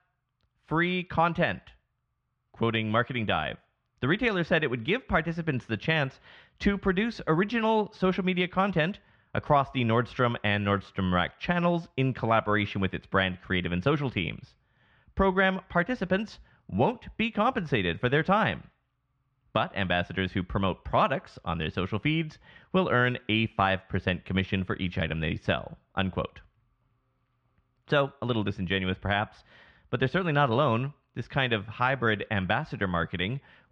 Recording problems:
muffled; slightly; fading above 3 kHz

